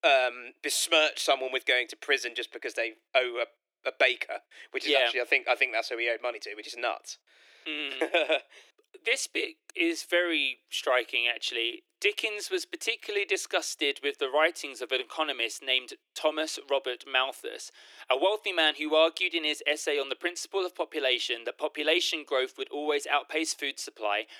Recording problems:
thin; very; fading below 300 Hz

